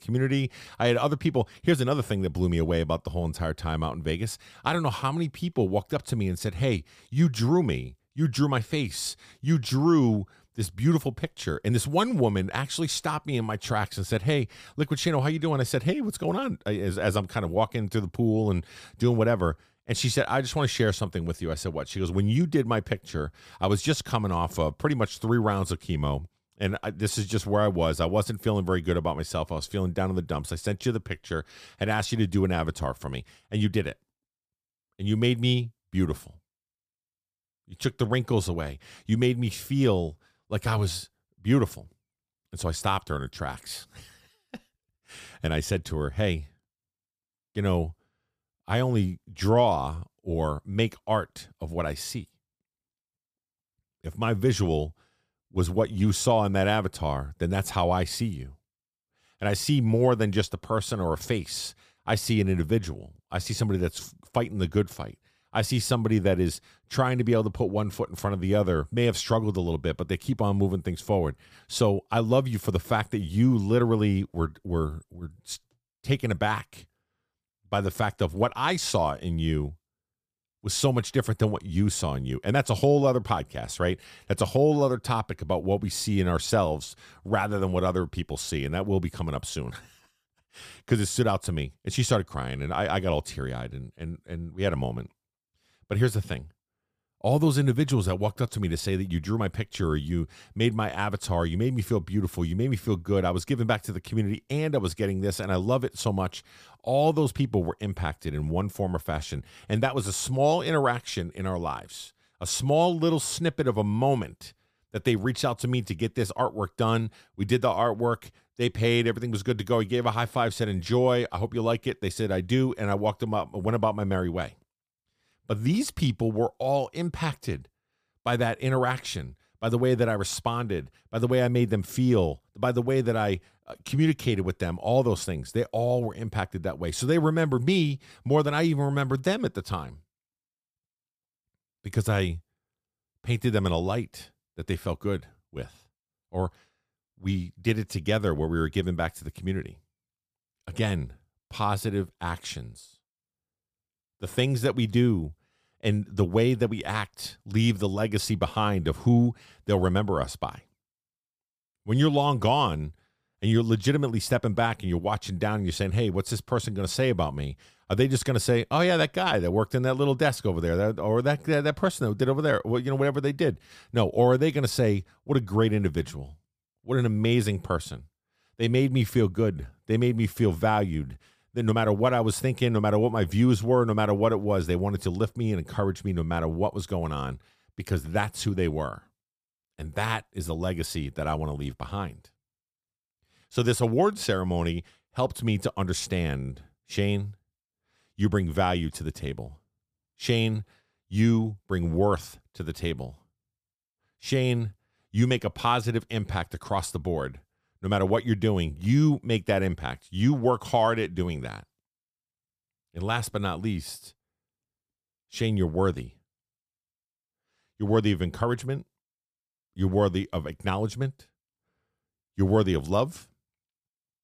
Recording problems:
none

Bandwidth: 15 kHz